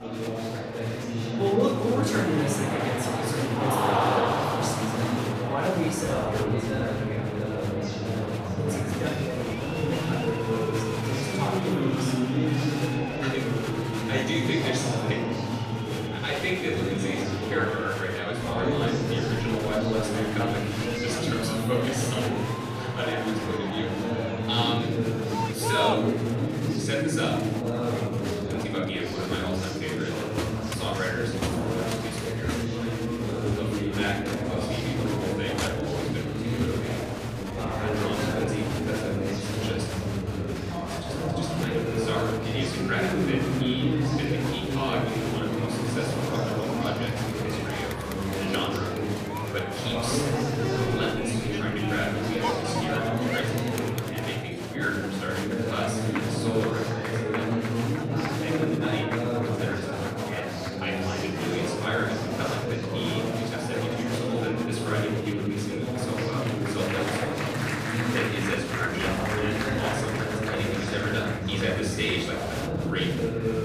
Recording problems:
off-mic speech; far
room echo; noticeable; dies away in 0.7 s
chatter from many people; very loud; throughout; 4 dB above the speech
background music; noticeable; throughout; 15 dB below the speech

